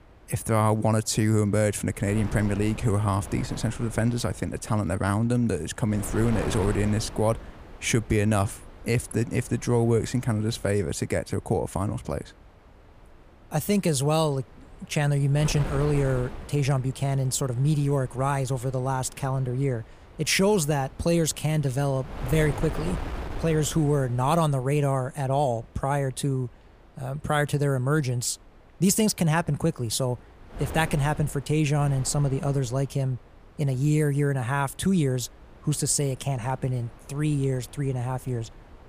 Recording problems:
wind noise on the microphone; occasional gusts; 15 dB below the speech

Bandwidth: 15 kHz